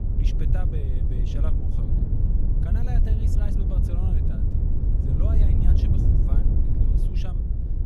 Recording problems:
wind noise on the microphone; heavy; 4 dB above the speech

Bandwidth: 13.5 kHz